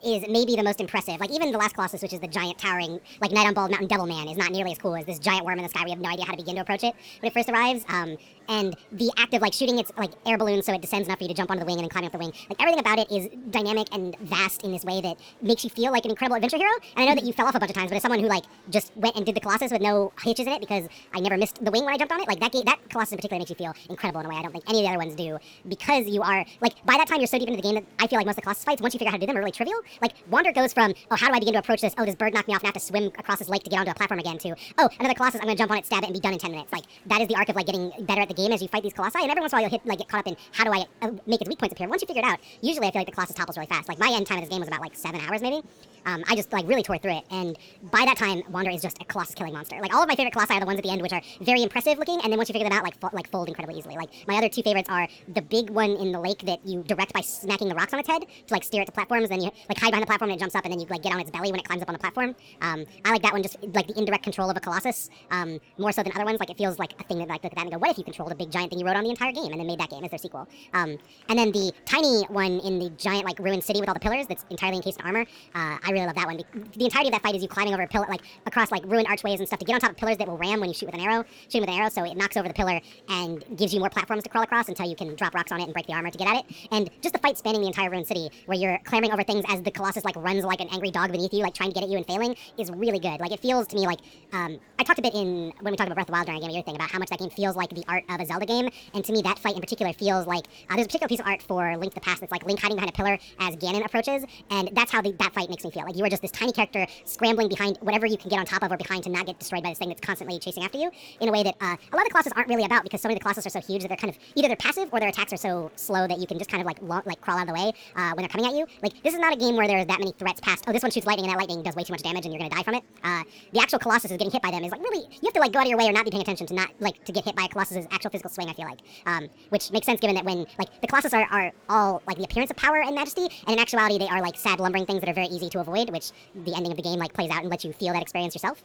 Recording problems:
wrong speed and pitch; too fast and too high; 1.6 times normal speed
murmuring crowd; faint; throughout; 30 dB below the speech

